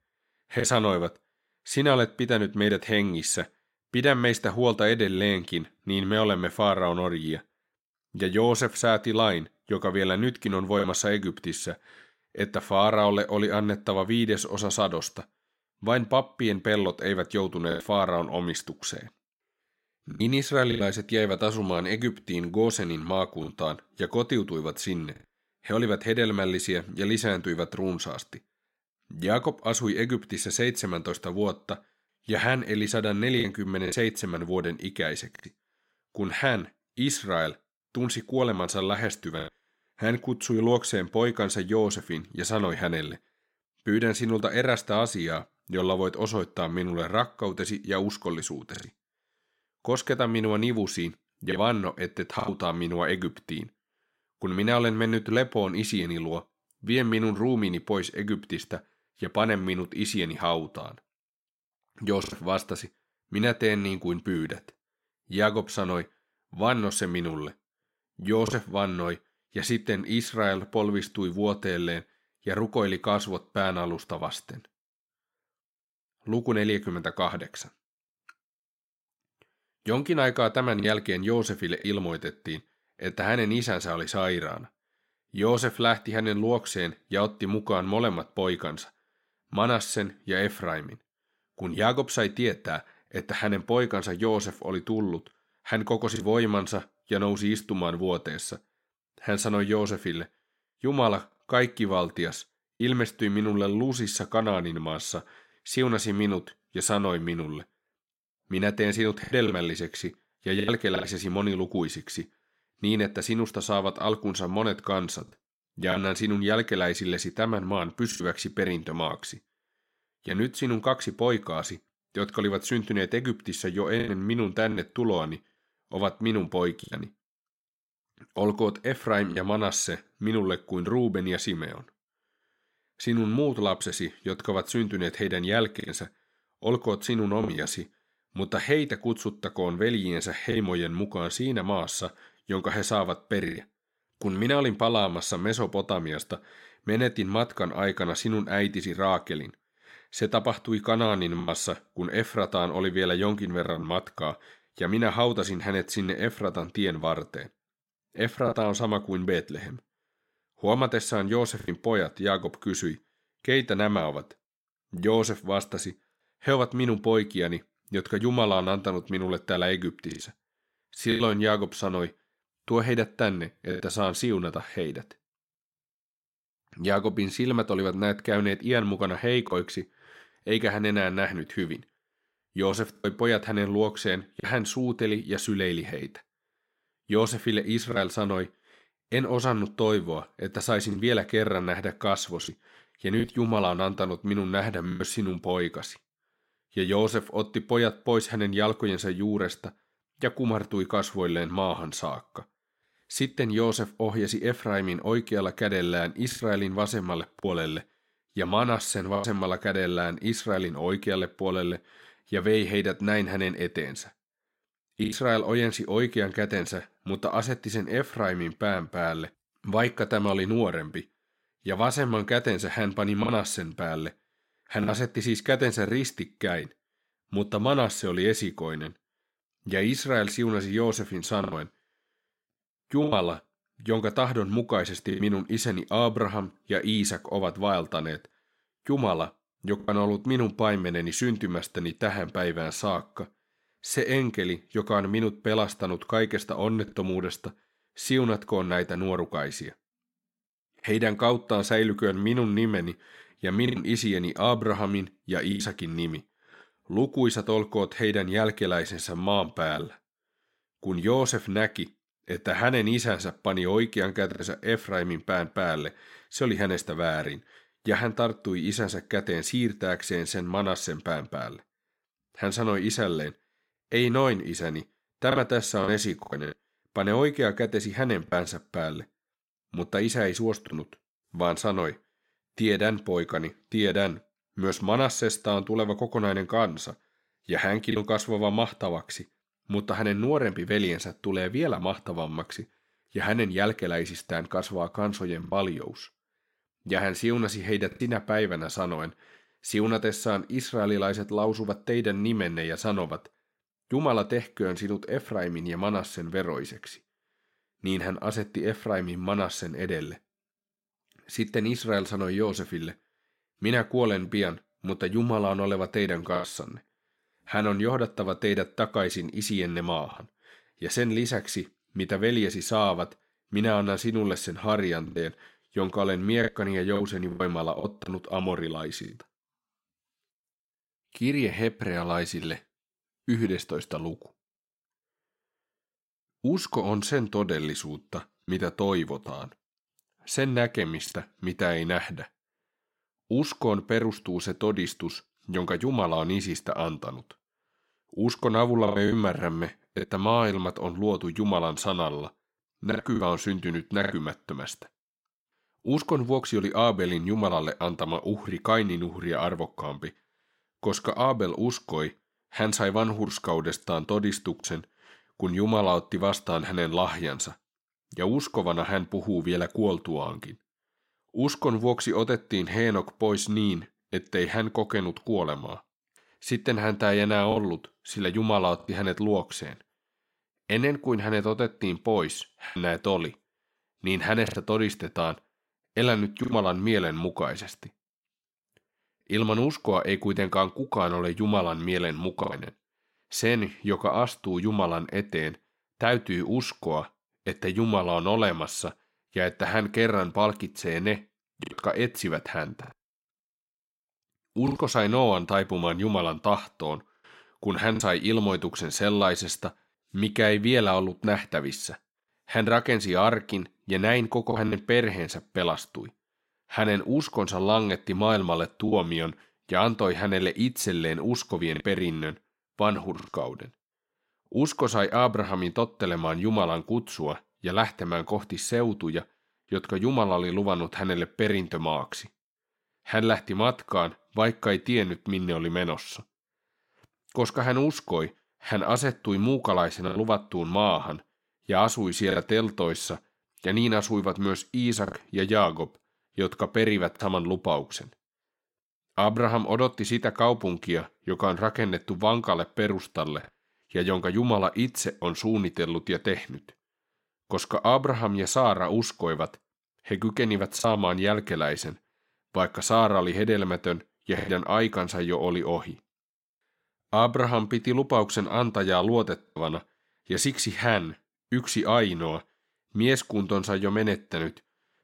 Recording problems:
choppy; occasionally; 2% of the speech affected

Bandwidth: 16 kHz